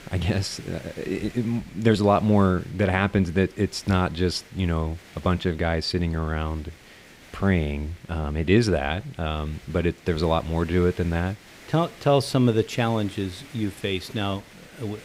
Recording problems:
hiss; faint; throughout; 20 dB below the speech

